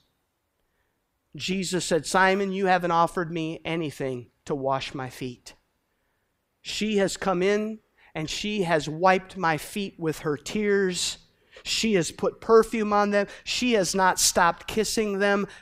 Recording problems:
none

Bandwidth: 15.5 kHz